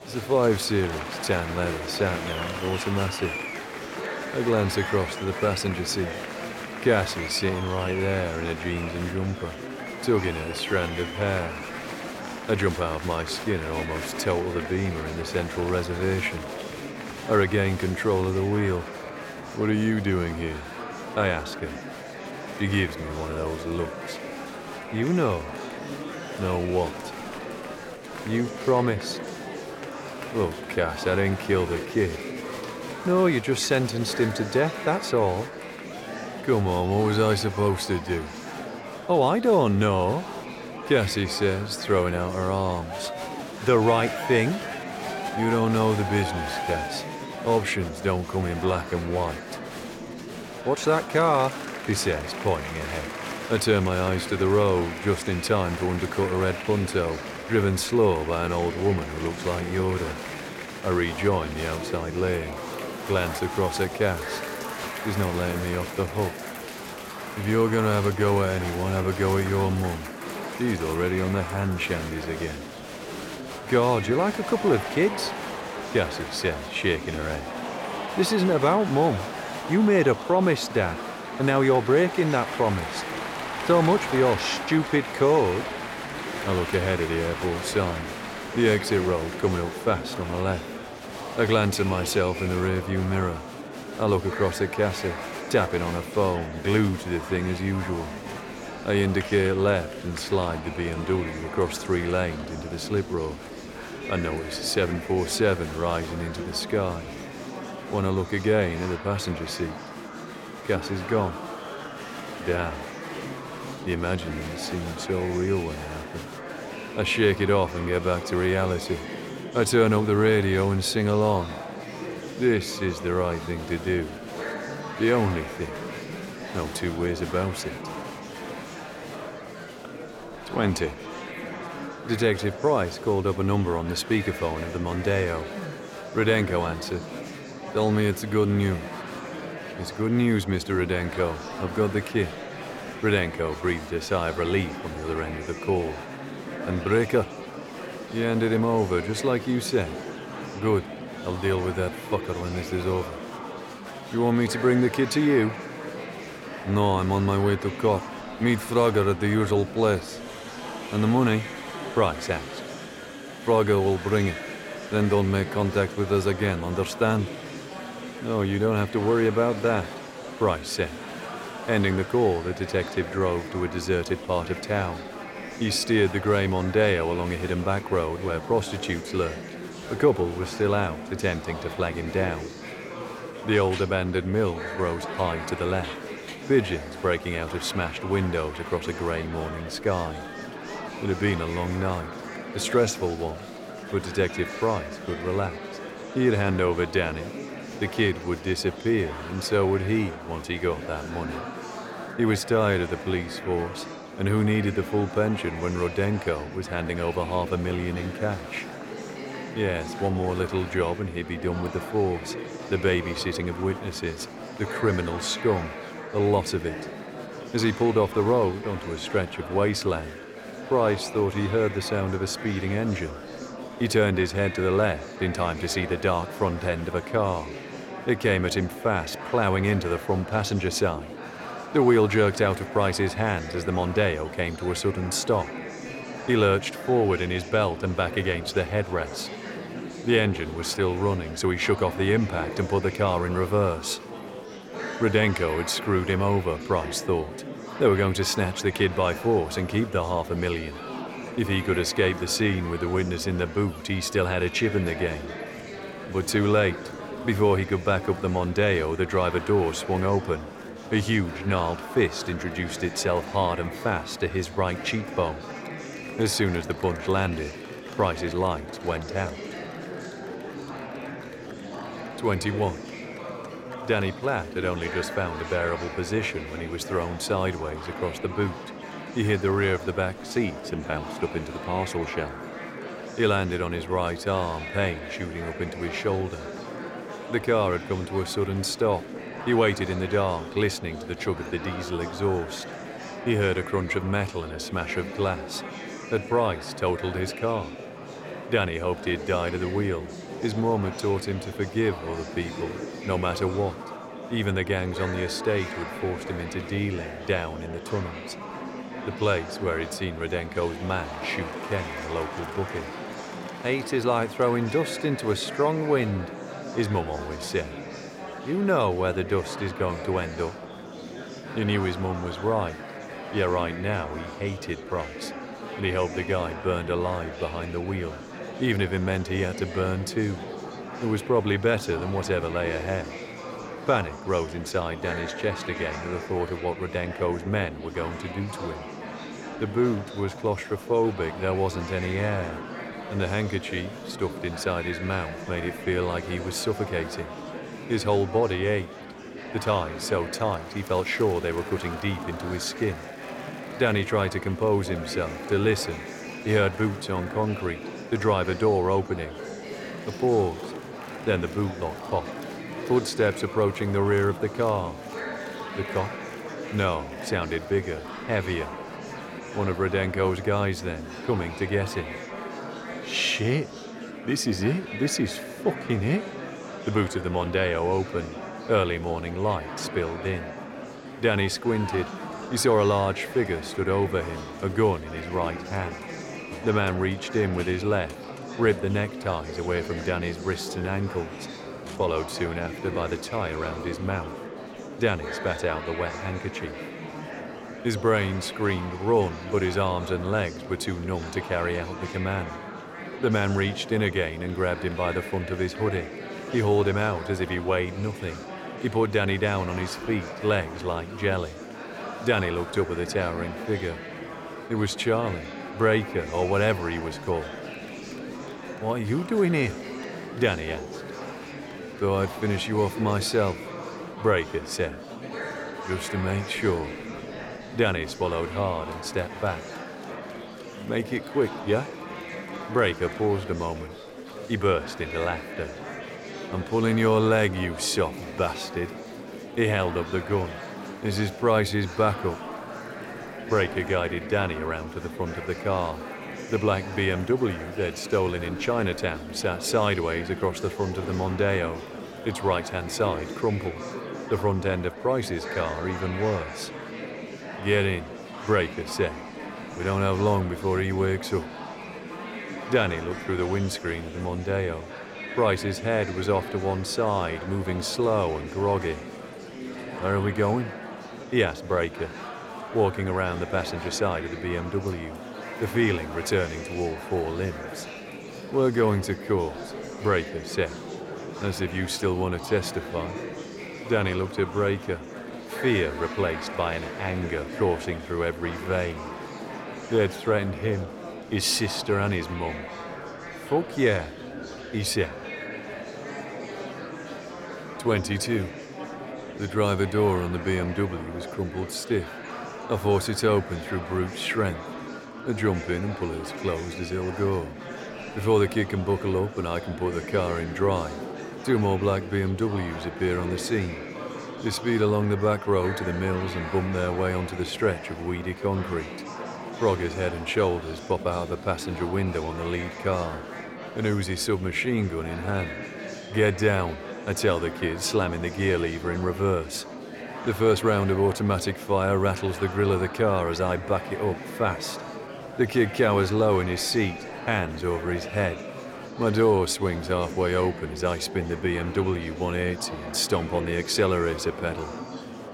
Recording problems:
murmuring crowd; loud; throughout; 10 dB below the speech

